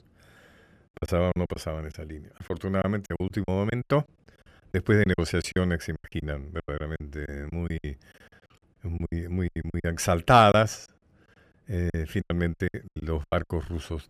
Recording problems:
choppy; very; 16% of the speech affected

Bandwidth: 14.5 kHz